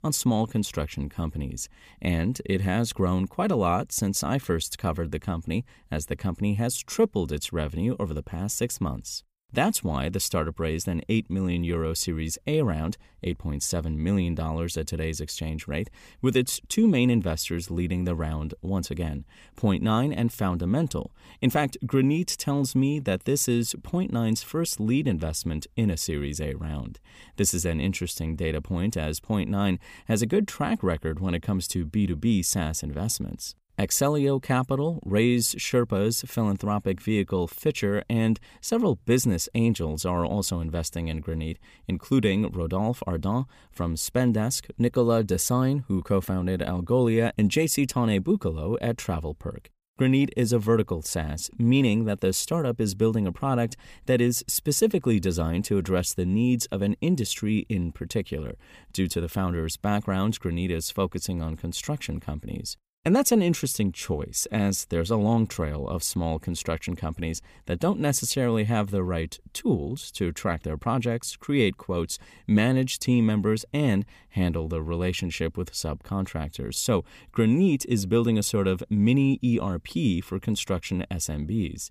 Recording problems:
none

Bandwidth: 15 kHz